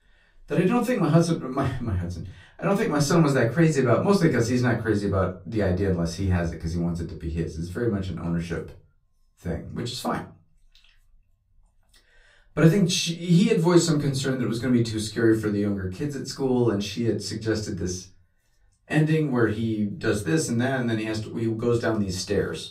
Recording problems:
off-mic speech; far
room echo; very slight; dies away in 0.3 s

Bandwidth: 15.5 kHz